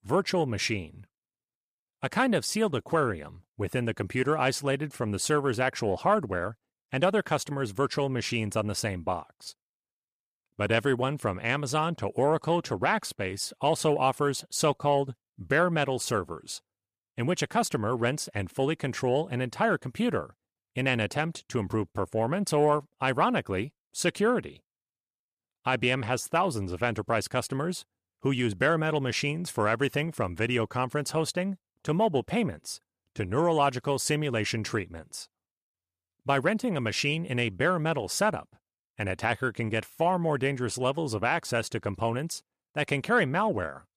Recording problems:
none

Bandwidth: 14.5 kHz